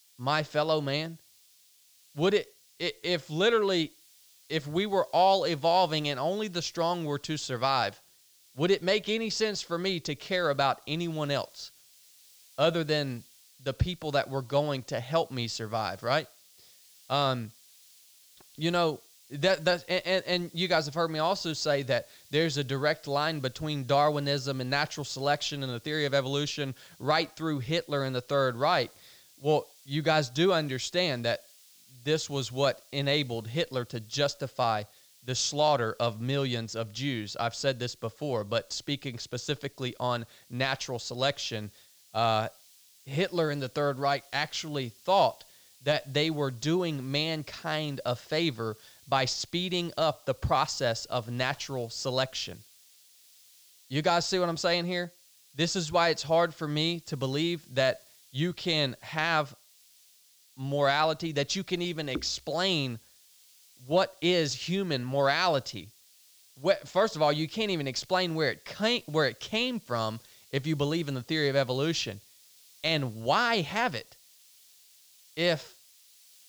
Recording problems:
high frequencies cut off; noticeable; nothing above 8 kHz
hiss; faint; throughout; 25 dB below the speech

